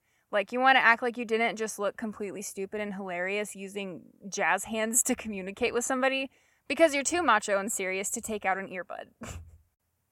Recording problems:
none

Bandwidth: 16.5 kHz